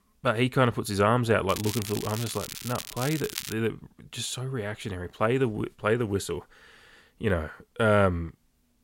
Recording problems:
crackling; loud; from 1.5 to 3.5 s; 8 dB below the speech

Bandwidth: 16 kHz